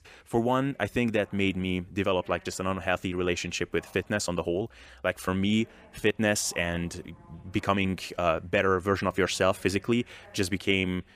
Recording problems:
voice in the background; faint; throughout; 30 dB below the speech

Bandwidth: 15 kHz